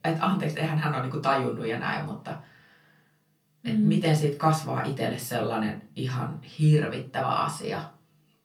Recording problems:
off-mic speech; far
room echo; very slight; dies away in 0.2 s

